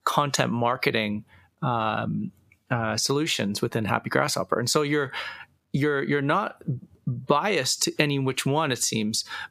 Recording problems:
squashed, flat; heavily

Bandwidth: 15 kHz